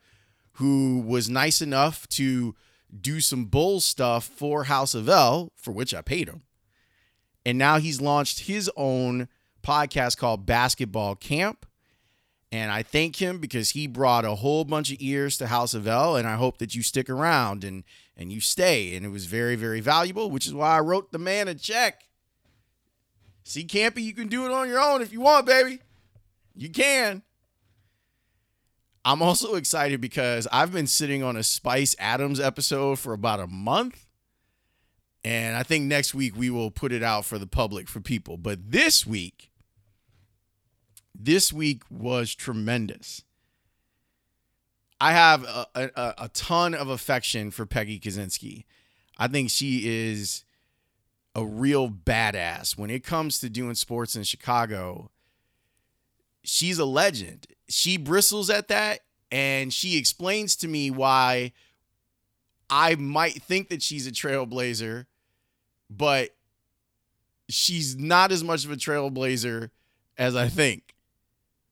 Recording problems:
none

